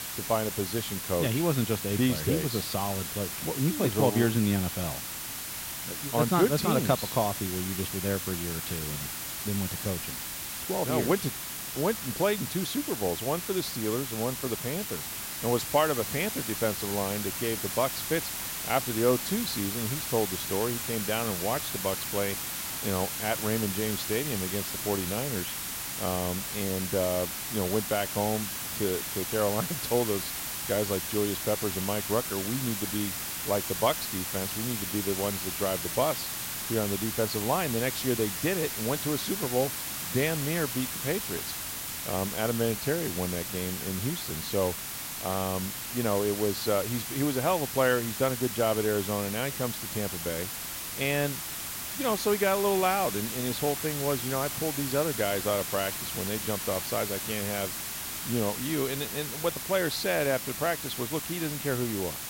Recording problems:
hiss; loud; throughout; 2 dB below the speech

